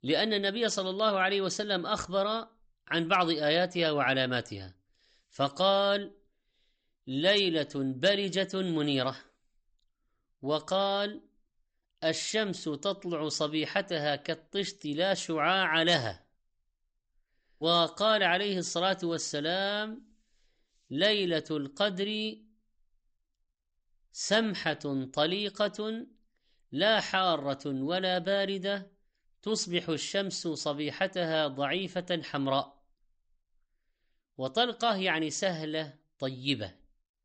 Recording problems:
high frequencies cut off; noticeable; nothing above 8 kHz

